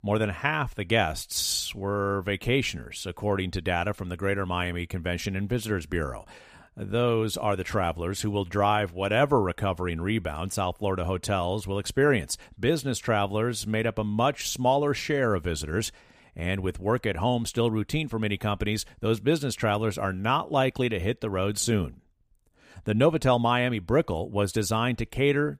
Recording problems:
none

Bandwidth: 15 kHz